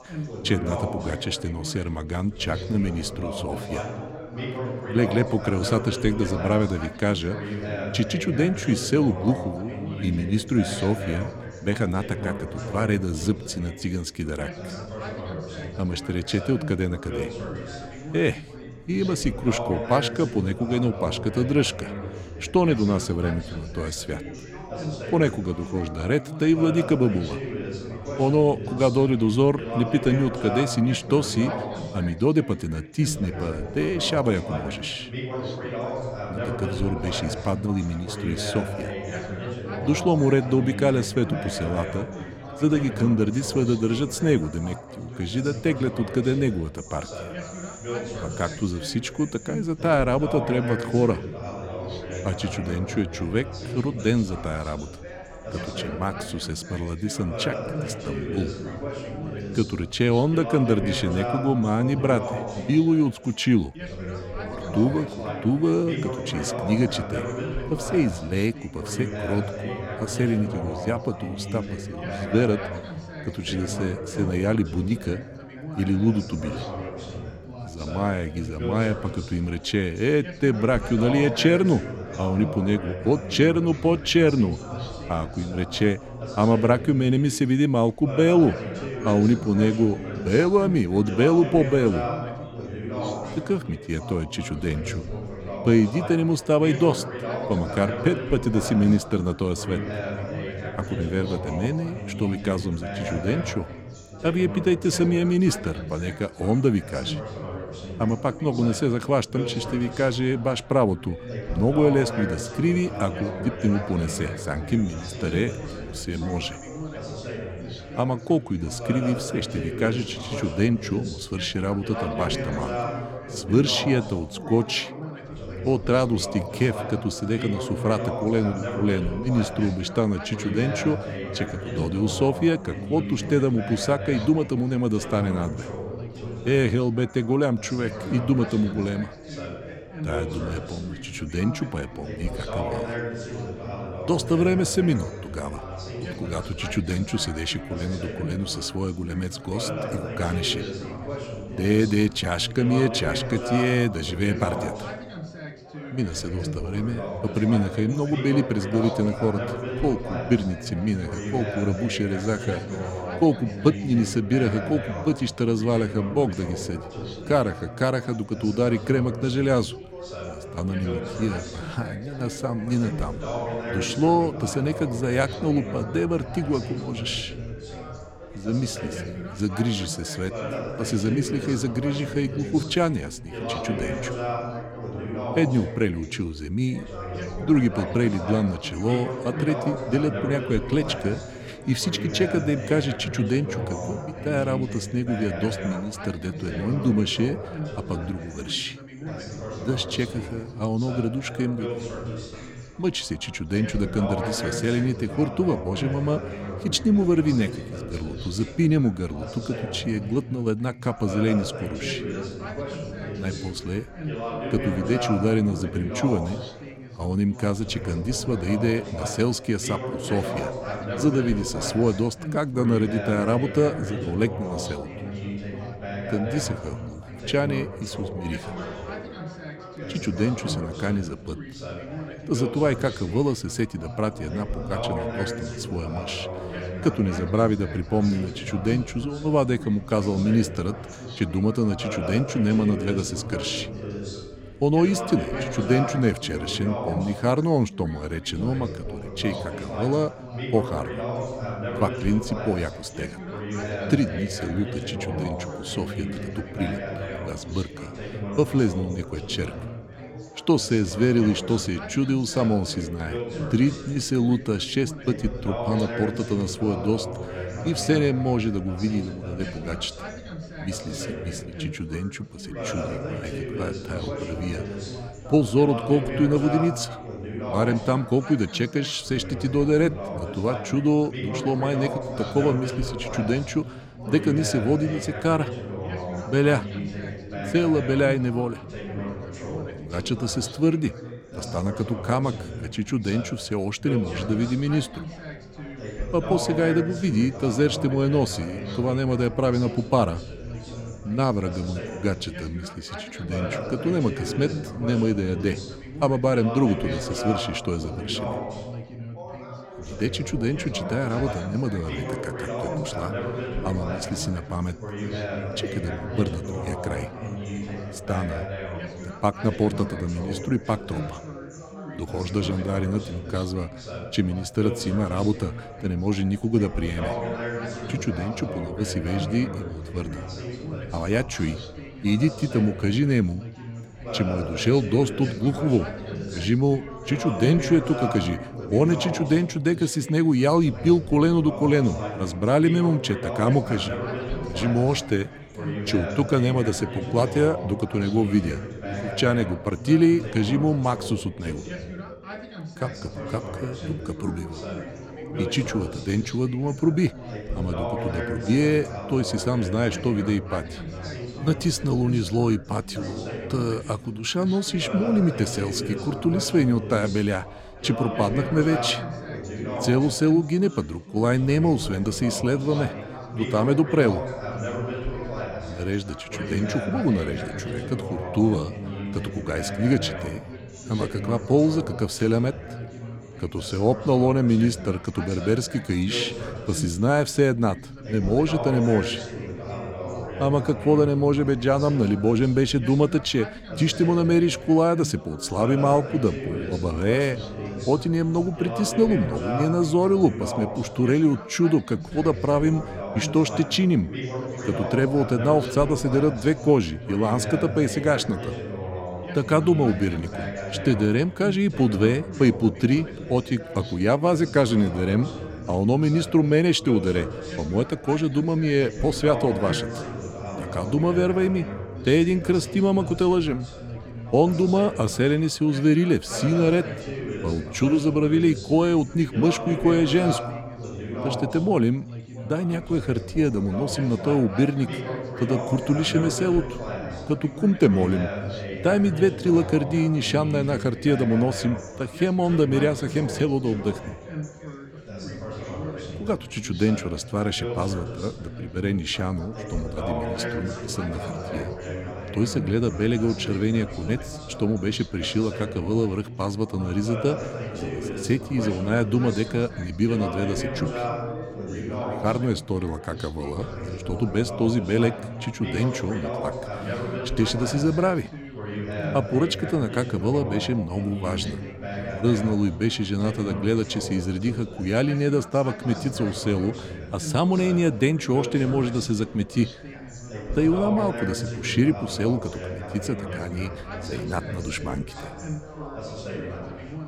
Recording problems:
background chatter; loud; throughout; 4 voices, 9 dB below the speech

